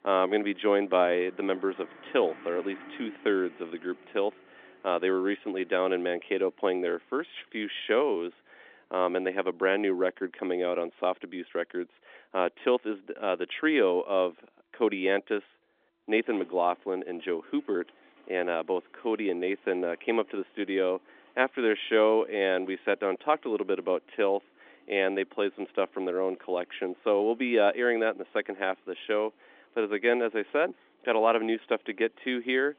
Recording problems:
phone-call audio; nothing above 3.5 kHz
traffic noise; faint; throughout; 25 dB below the speech

